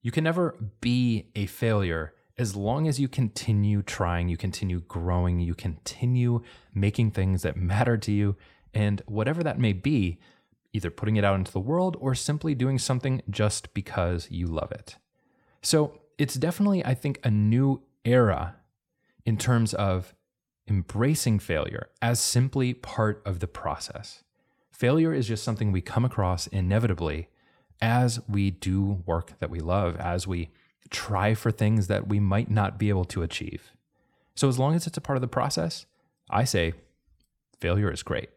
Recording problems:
none

